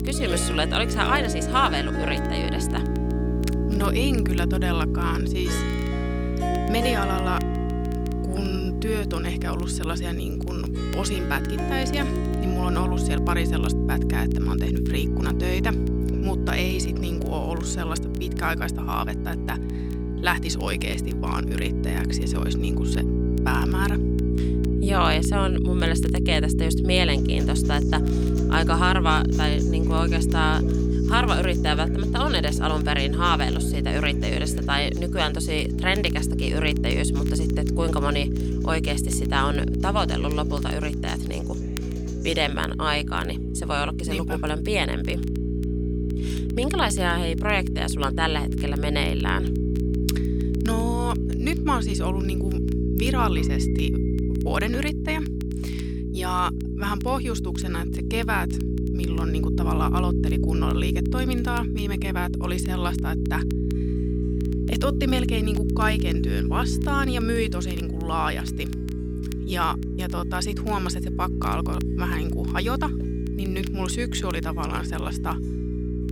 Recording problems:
electrical hum; loud; throughout; 60 Hz, 6 dB below the speech
background music; noticeable; throughout; 10 dB below the speech
crackle, like an old record; faint; 25 dB below the speech

